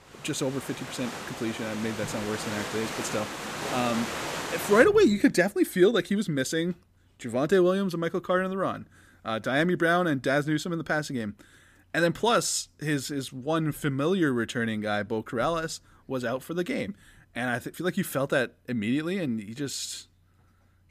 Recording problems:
rain or running water; loud; until 5 s; 7 dB below the speech

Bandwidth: 15 kHz